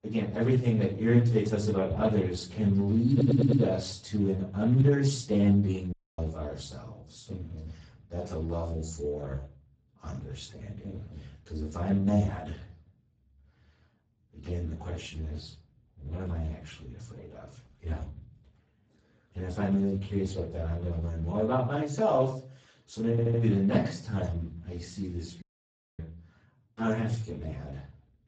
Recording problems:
off-mic speech; far
garbled, watery; badly; nothing above 7.5 kHz
room echo; slight; dies away in 0.5 s
audio stuttering; at 3 s and at 23 s
audio cutting out; at 6 s and at 25 s for 0.5 s

